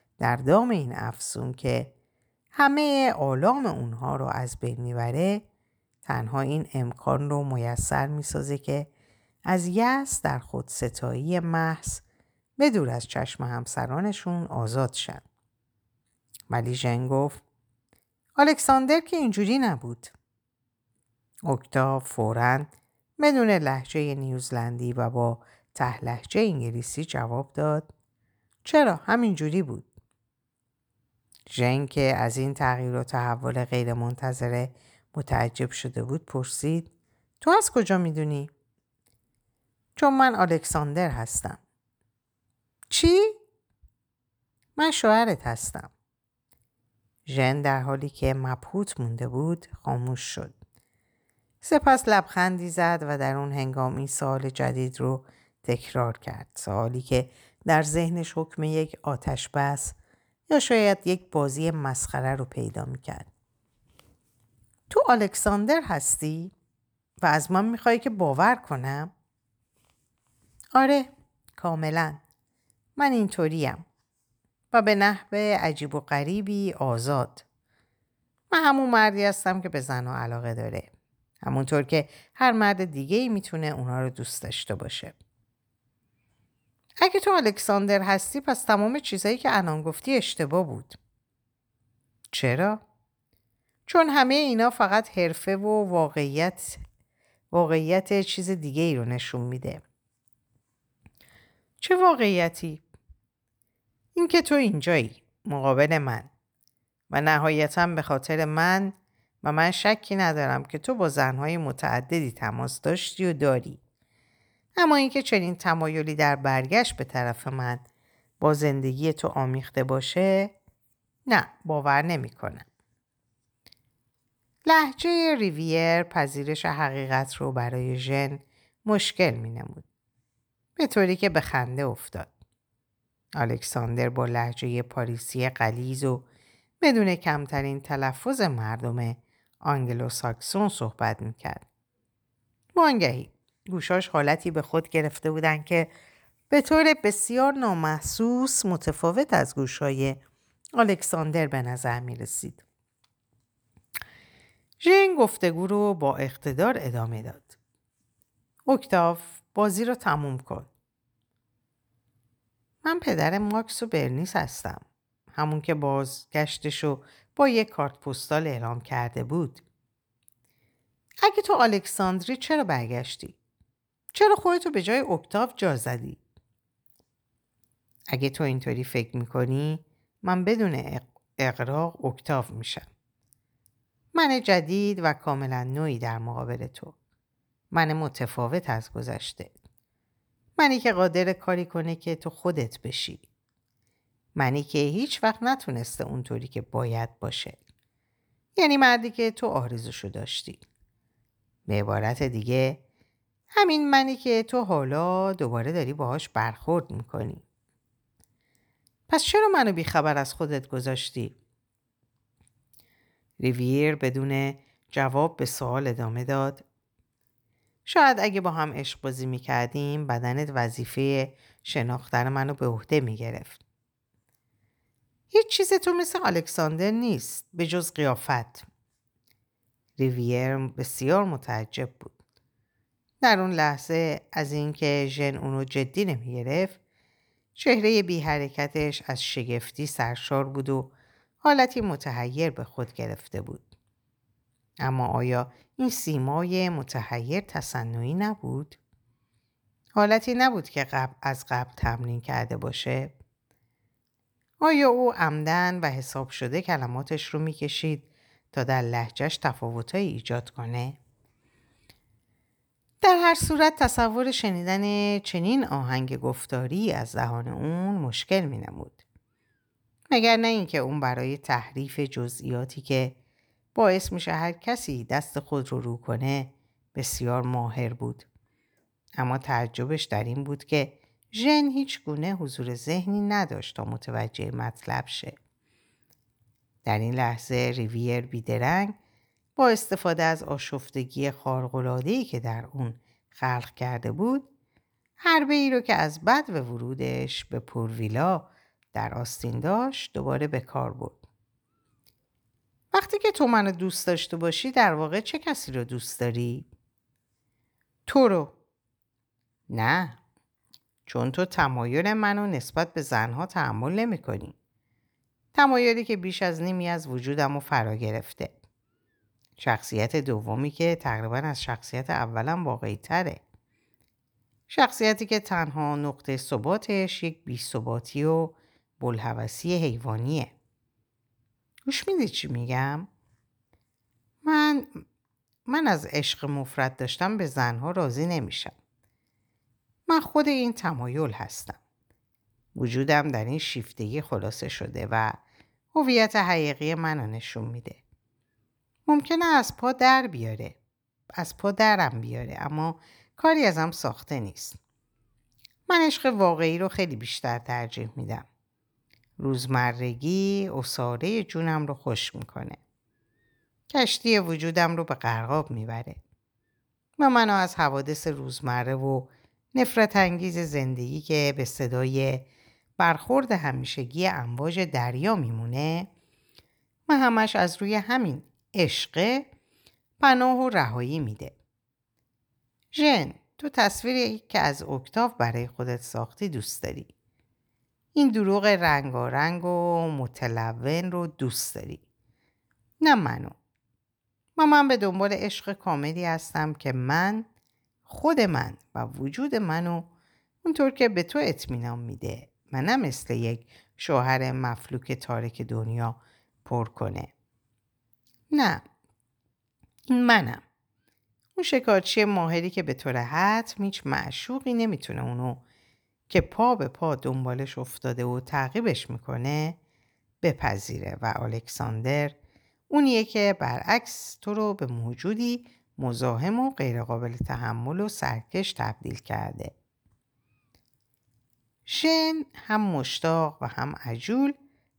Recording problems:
none

